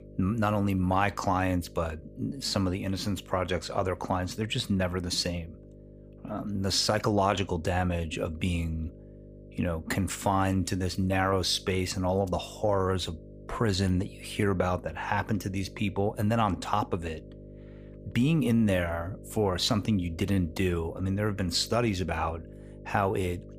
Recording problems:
electrical hum; faint; throughout; 50 Hz, 25 dB below the speech

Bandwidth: 15 kHz